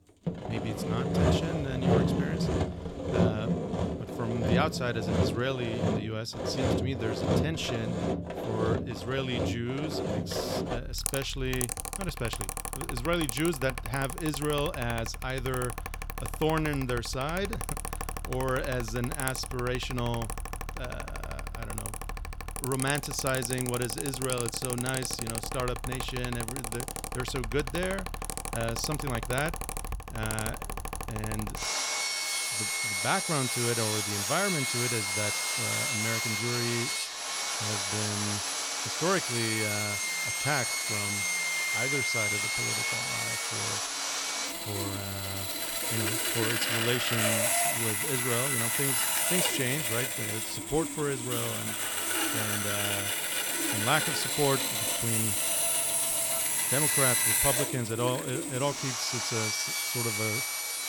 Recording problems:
machinery noise; very loud; throughout; 4 dB above the speech

